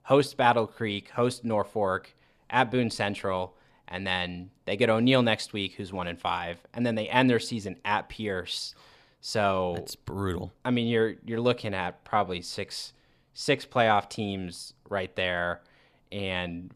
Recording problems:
none

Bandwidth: 14.5 kHz